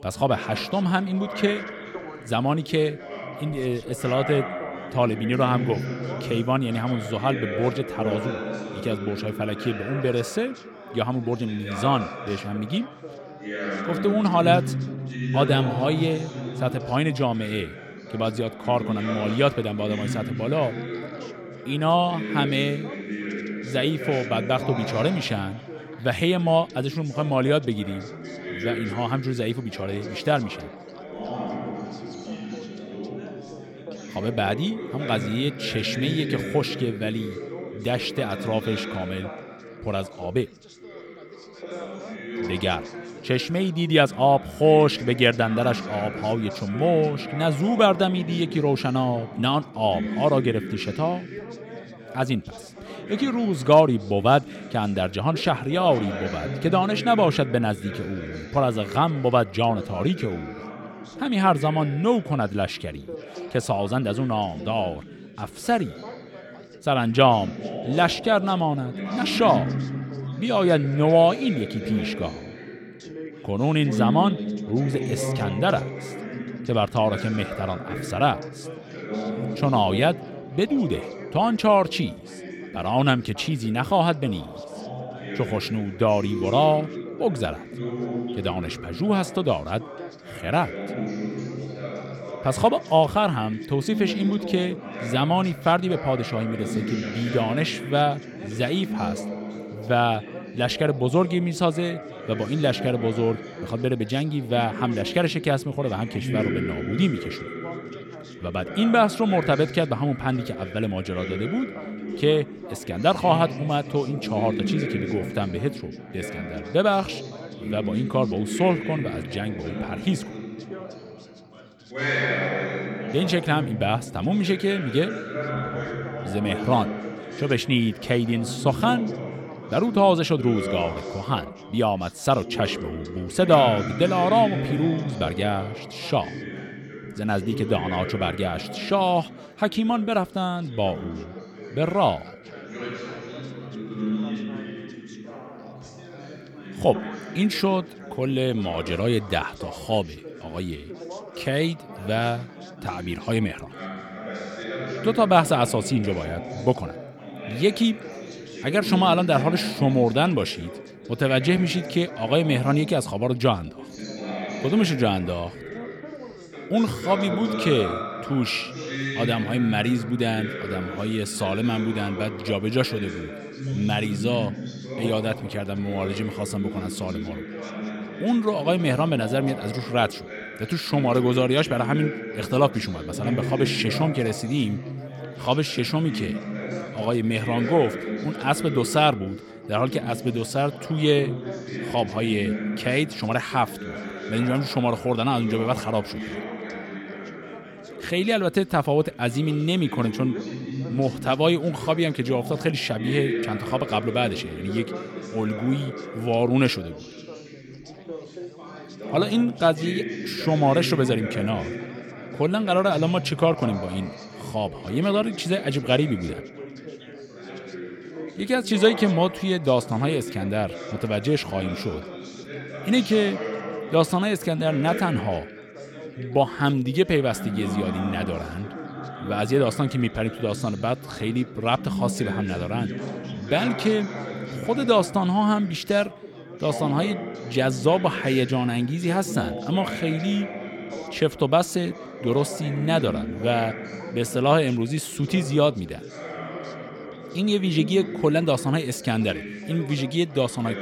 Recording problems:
background chatter; loud; throughout; 4 voices, 9 dB below the speech

